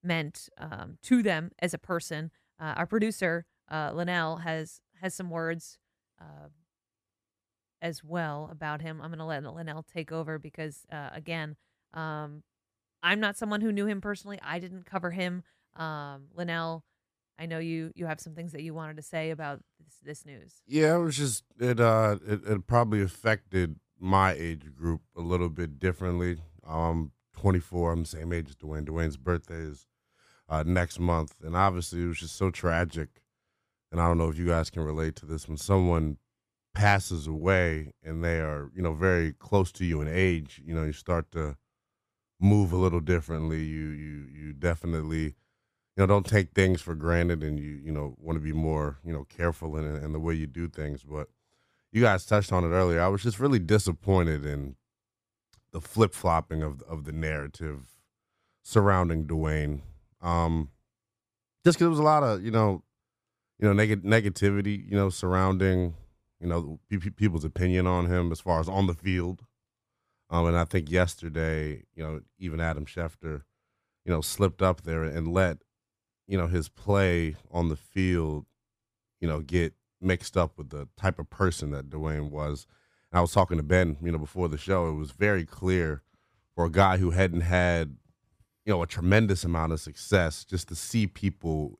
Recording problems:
none

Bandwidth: 15 kHz